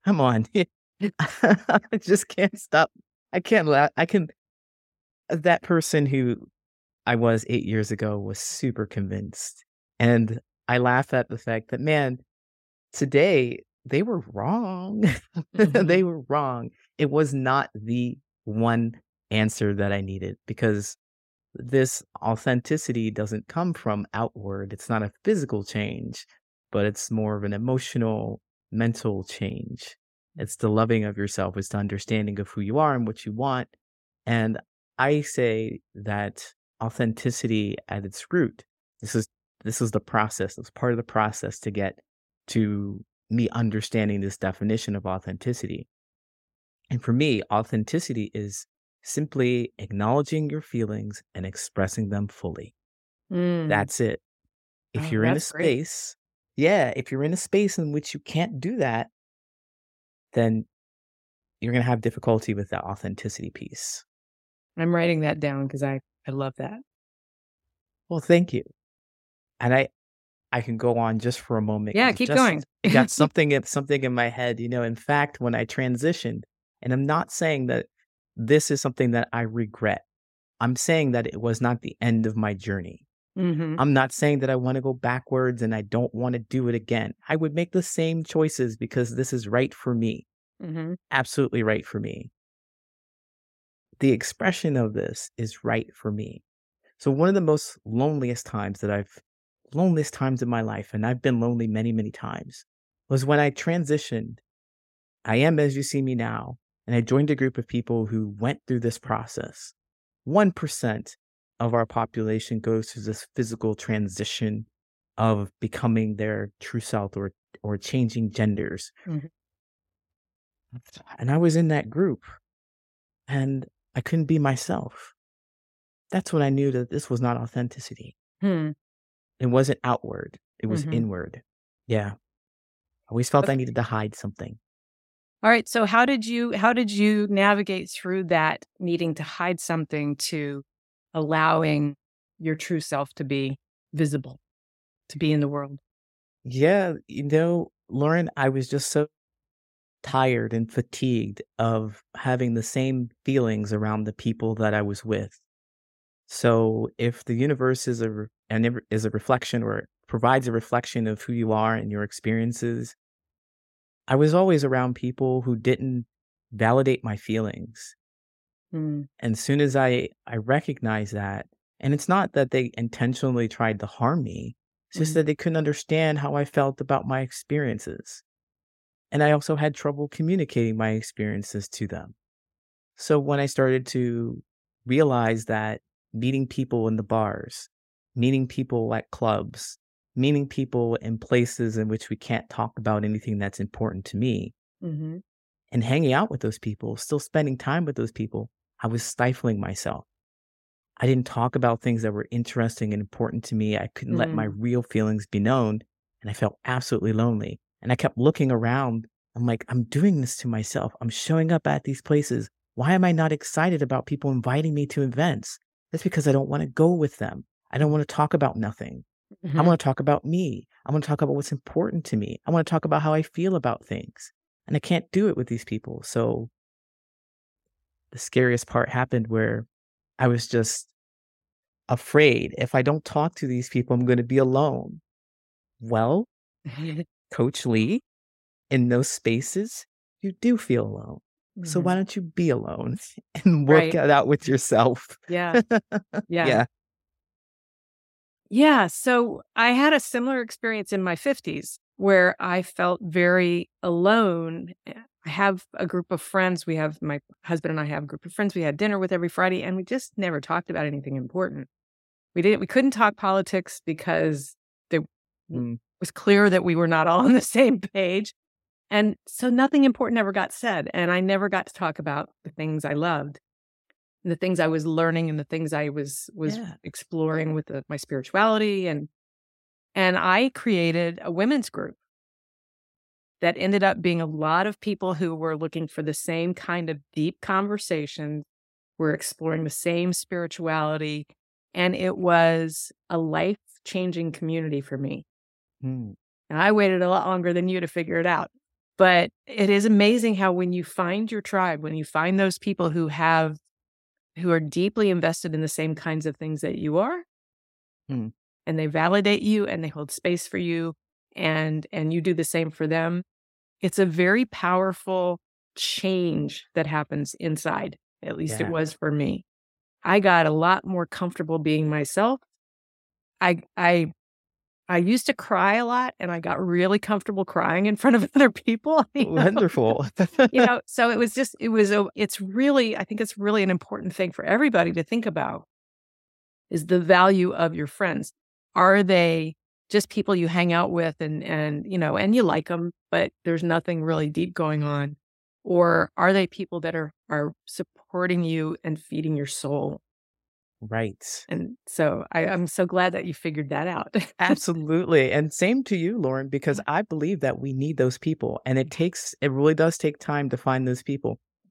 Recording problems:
none

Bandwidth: 16 kHz